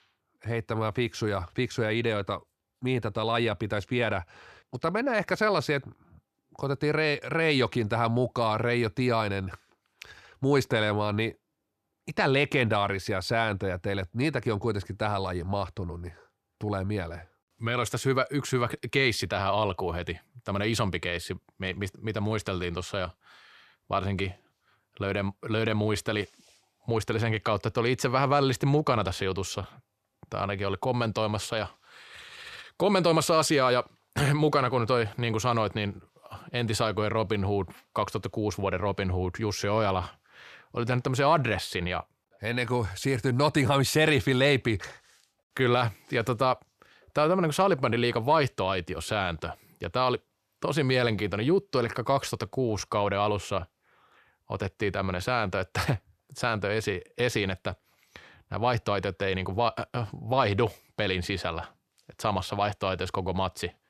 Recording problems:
none

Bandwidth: 14 kHz